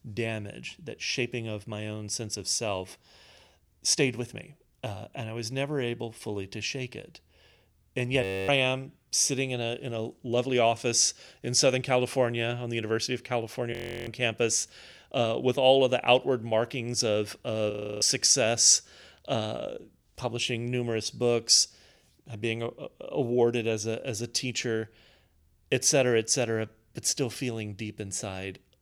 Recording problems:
audio freezing; at 8 s, at 14 s and at 18 s

